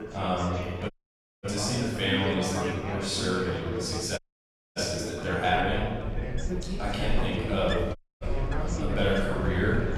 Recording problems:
room echo; strong; dies away in 1.4 s
off-mic speech; far
wind in the background; loud; throughout; 7 dB below the speech
chatter from many people; loud; throughout; 6 dB below the speech
audio cutting out; at 1 s for 0.5 s, at 4 s for 0.5 s and at 8 s

